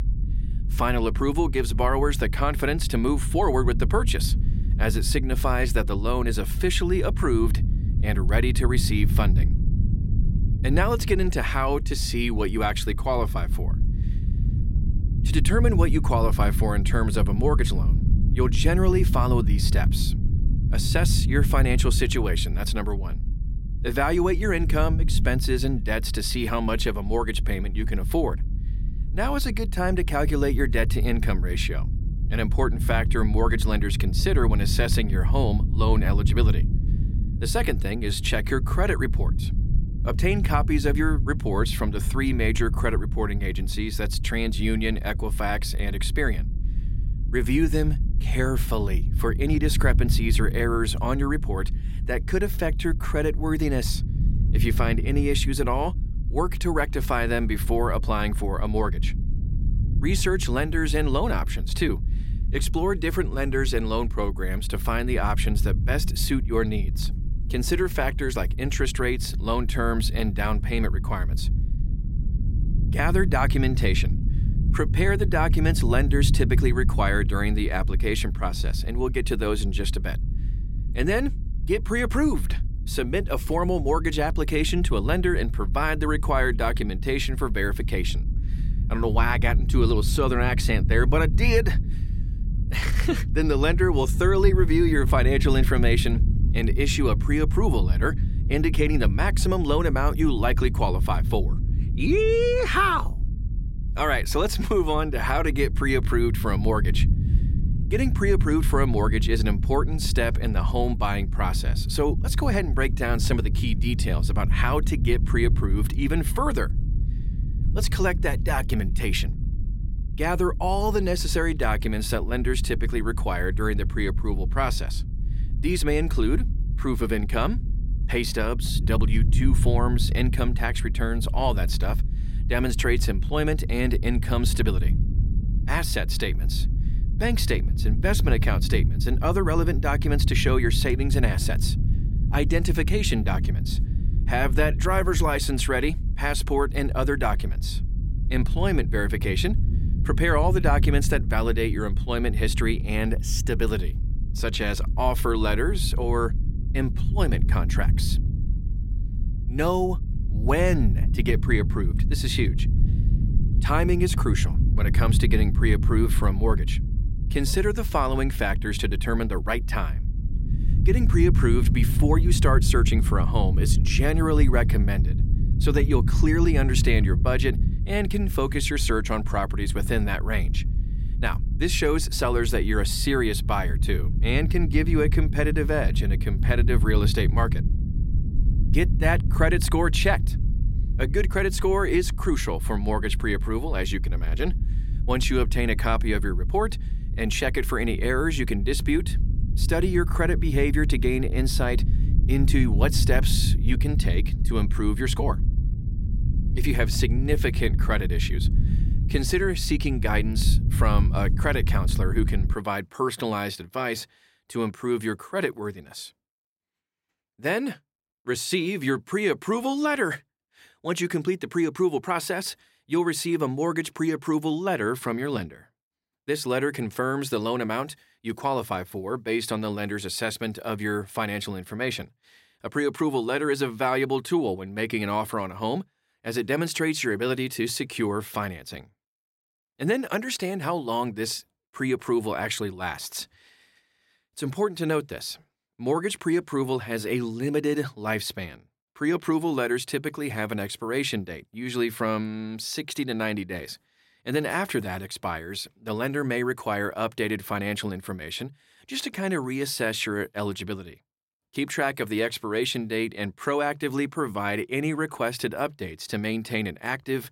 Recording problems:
low rumble; noticeable; until 3:33; 15 dB below the speech

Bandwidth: 16 kHz